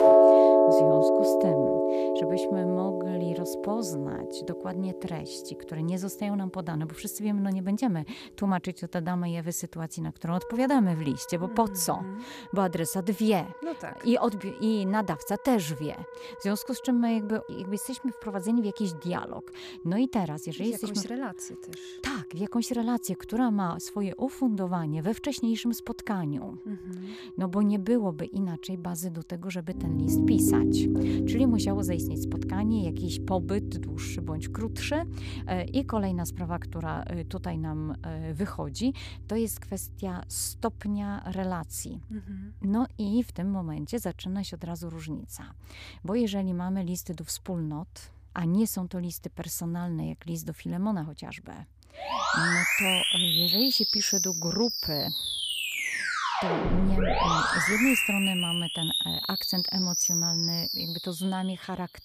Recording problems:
background music; very loud; throughout; 5 dB above the speech

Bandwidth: 14.5 kHz